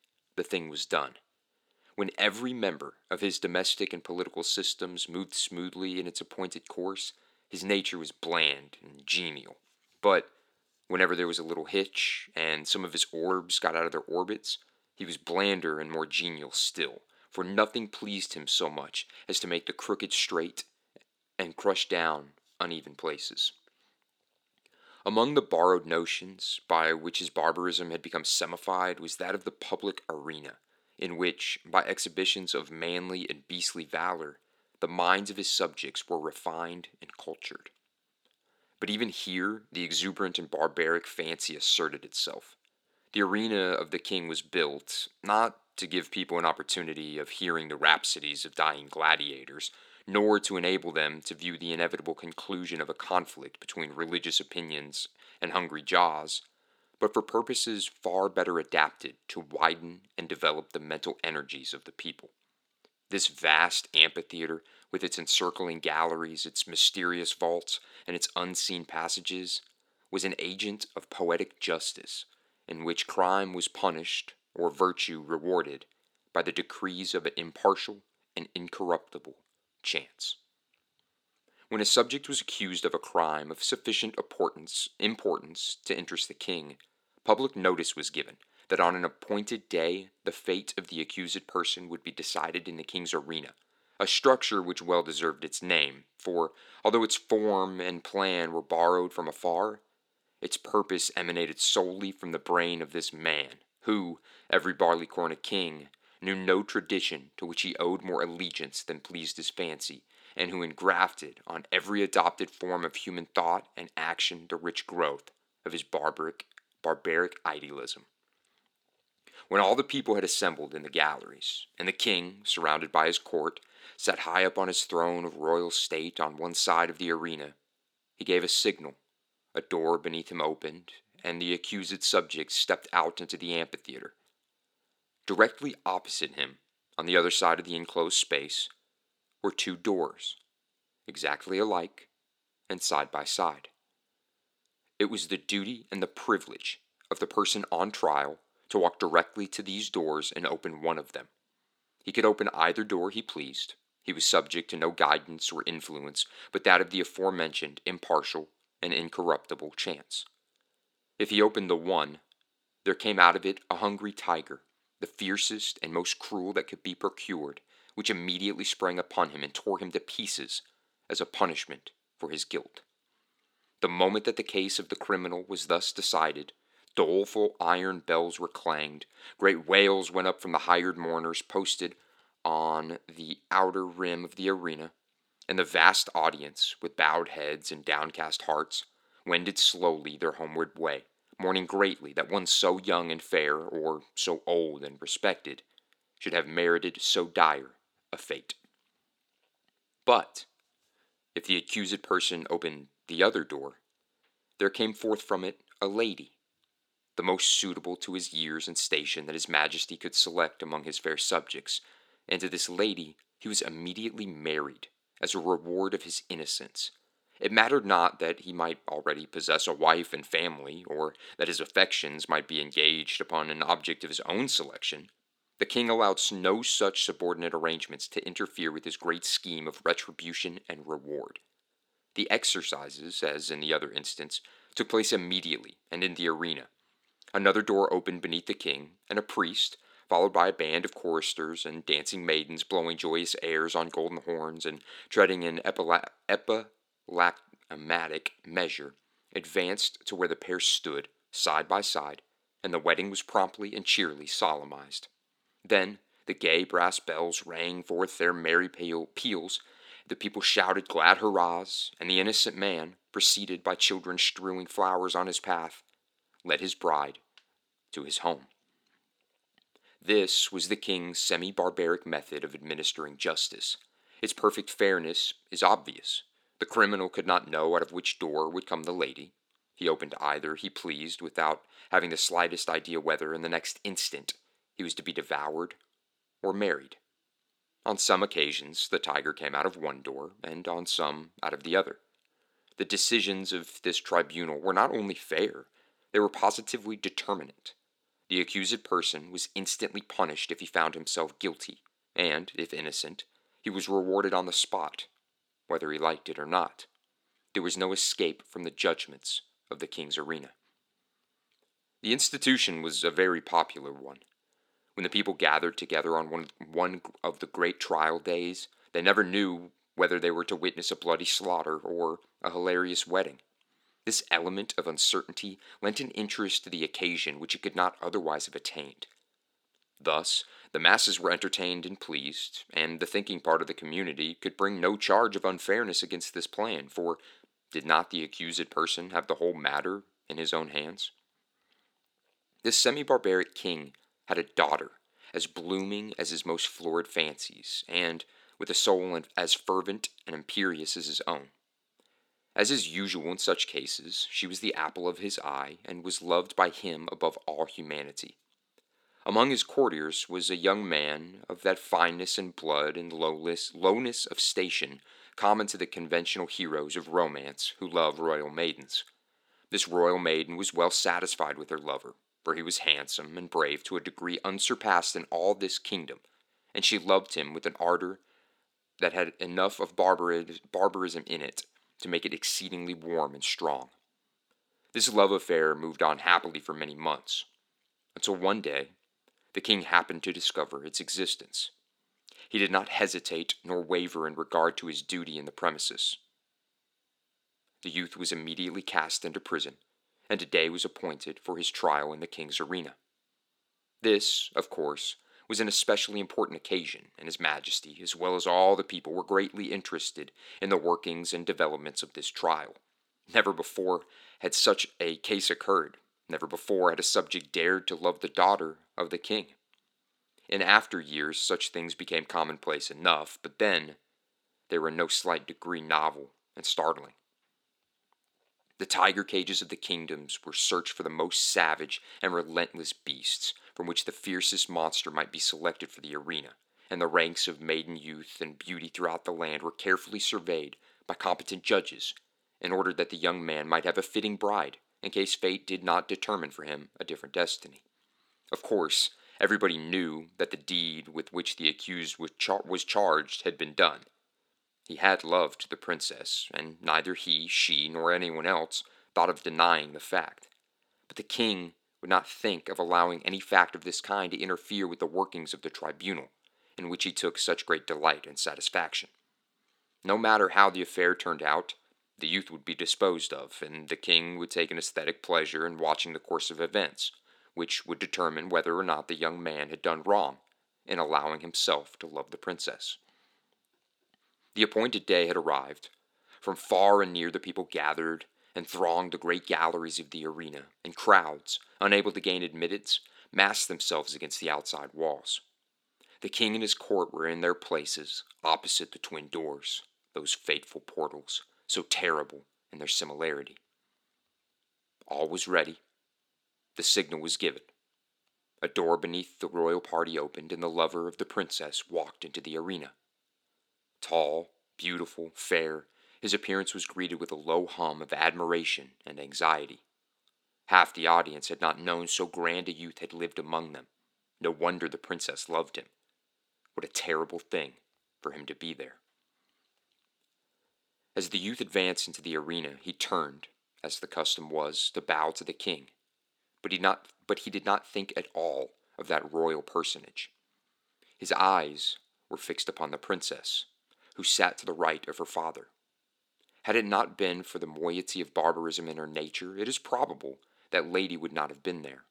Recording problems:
thin; somewhat; fading below 250 Hz

